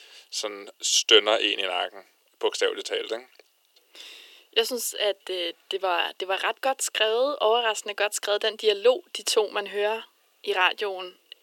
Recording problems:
thin; very; fading below 350 Hz

